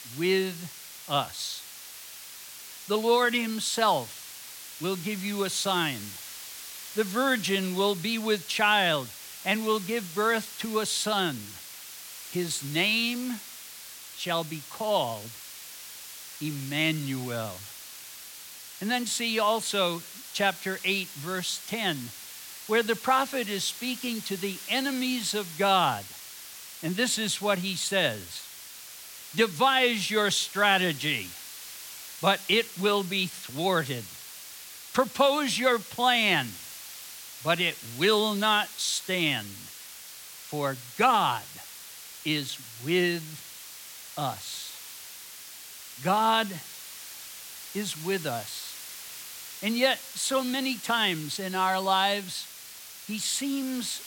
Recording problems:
hiss; noticeable; throughout; 15 dB below the speech

